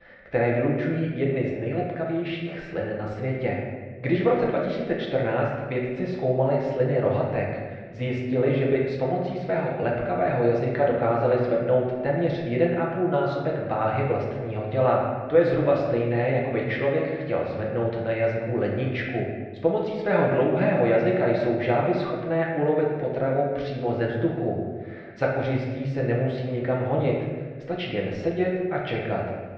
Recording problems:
off-mic speech; far
muffled; very; fading above 3 kHz
room echo; noticeable; dies away in 1.2 s

